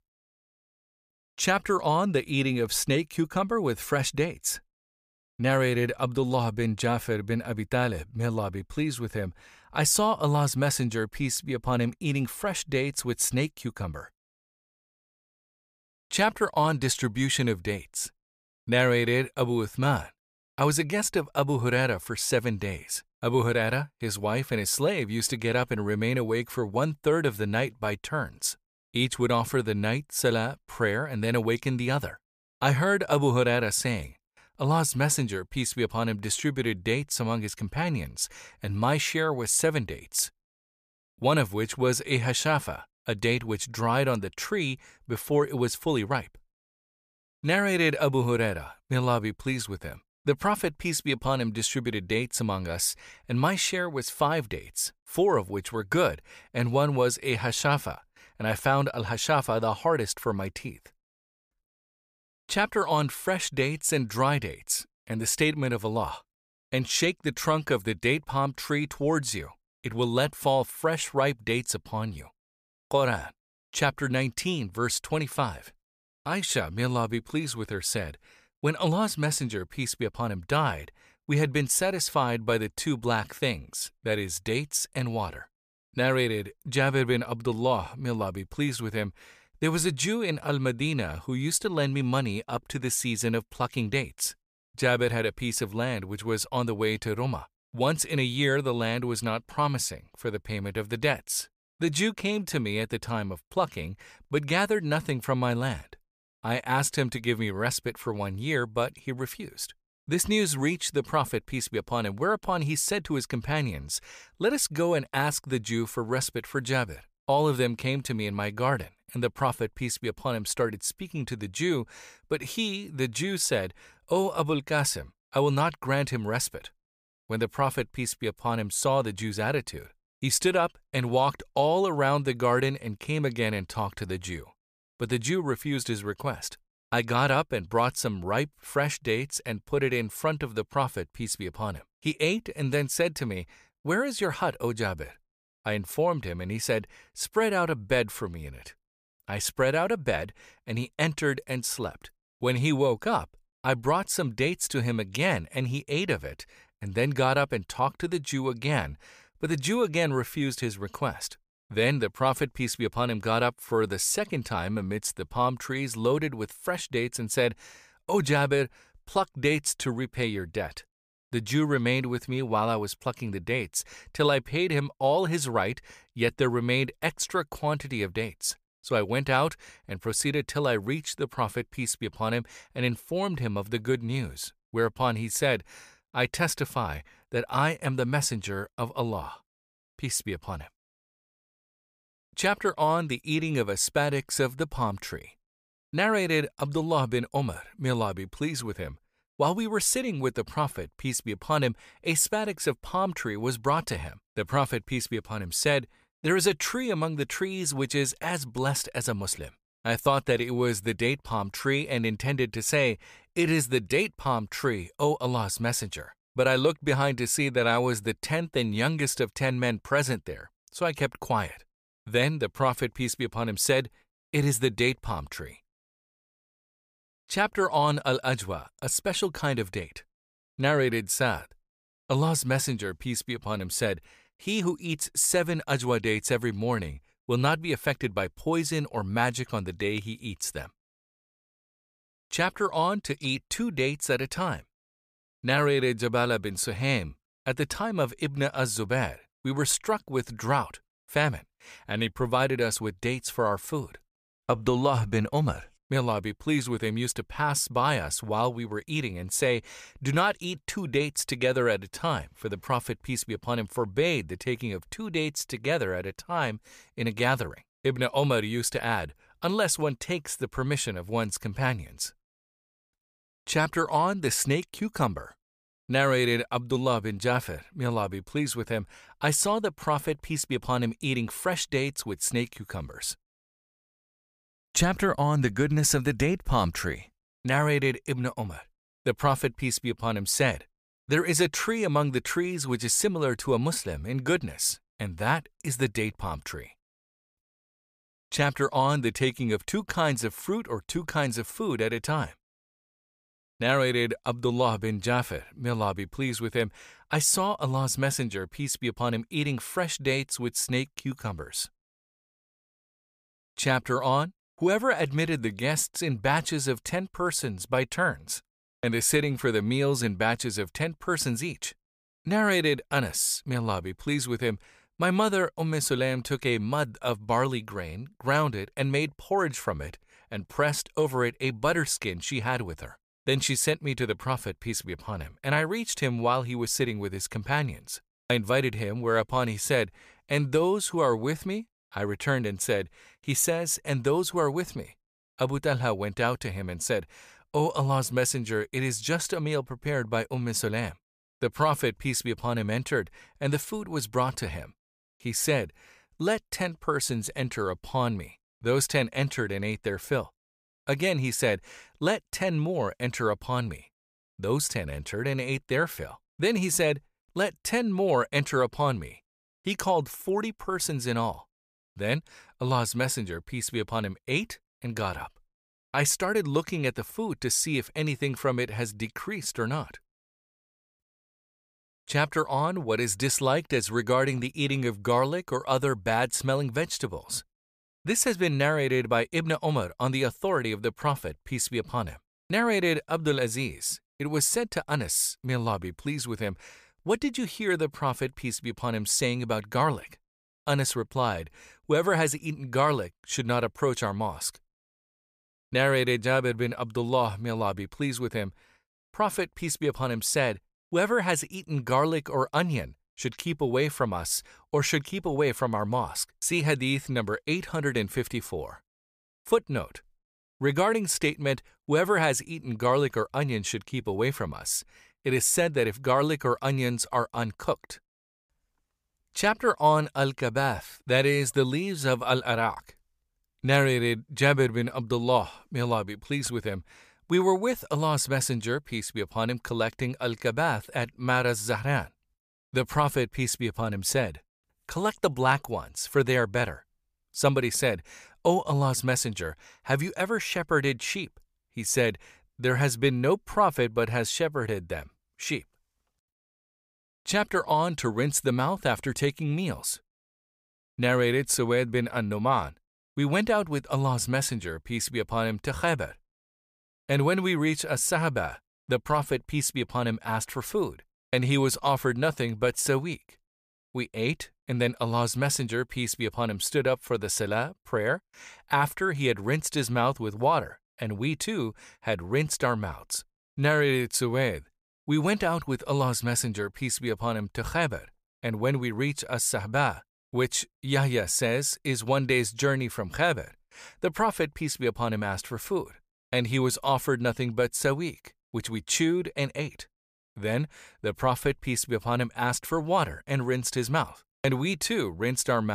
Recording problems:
abrupt cut into speech; at the end

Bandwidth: 15 kHz